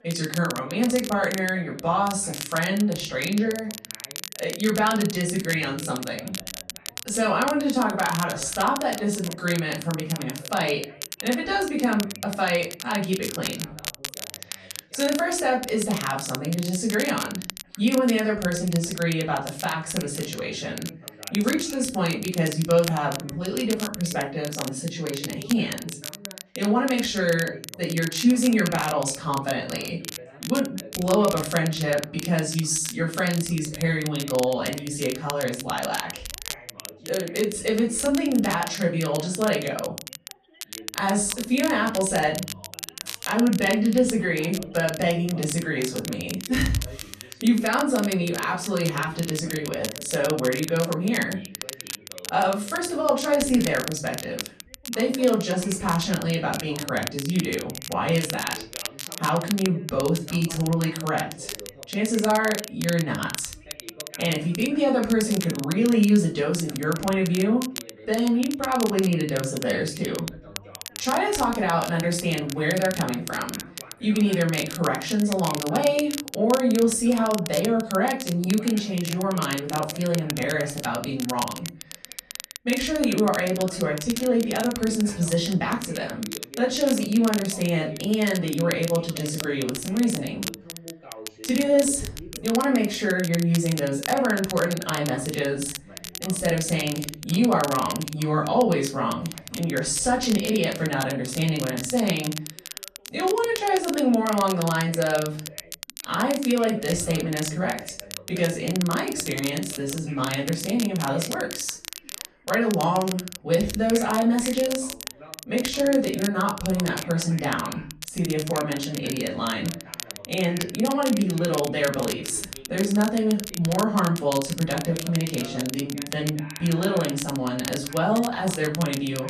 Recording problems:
off-mic speech; far
room echo; slight; dies away in 0.3 s
crackle, like an old record; noticeable; 10 dB below the speech
background chatter; faint; throughout; 2 voices, 20 dB below the speech

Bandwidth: 14 kHz